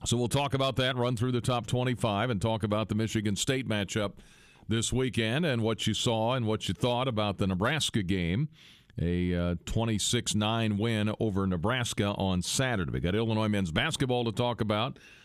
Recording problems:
squashed, flat; somewhat

